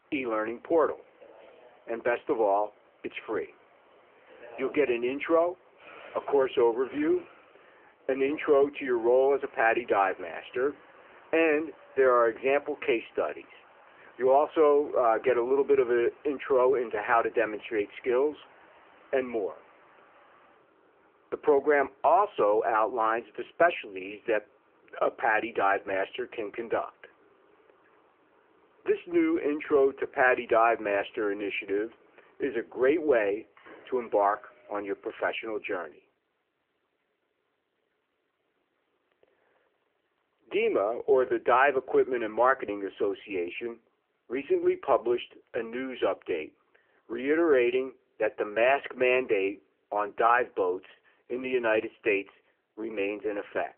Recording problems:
phone-call audio
traffic noise; faint; until 35 s; 30 dB below the speech

